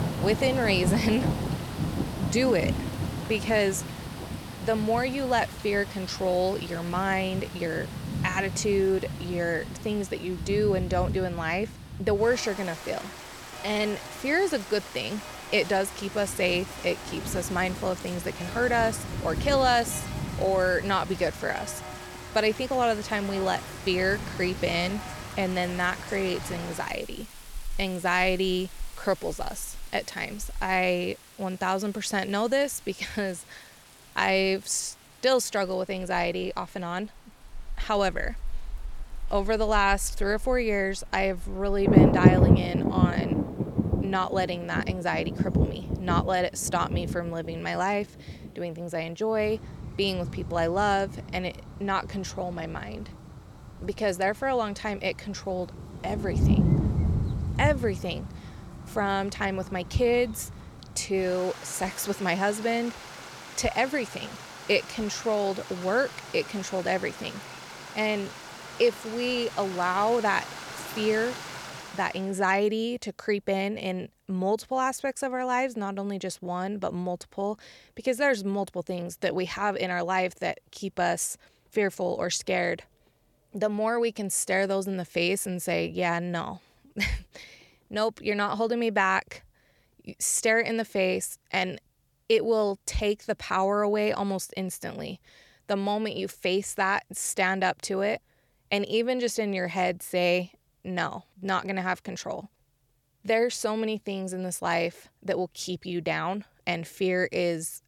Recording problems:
rain or running water; loud; until 1:12; 4 dB below the speech

